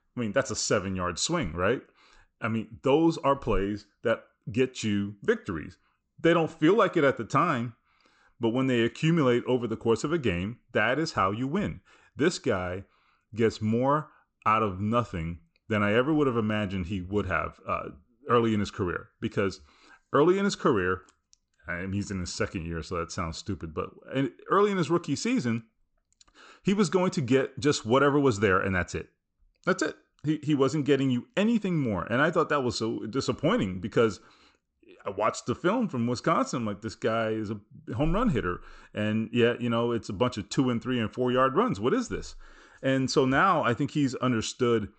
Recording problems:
high frequencies cut off; noticeable; nothing above 8 kHz

